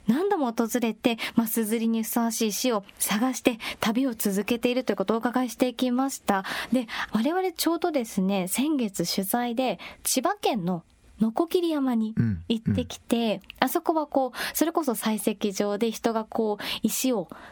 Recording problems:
squashed, flat; somewhat

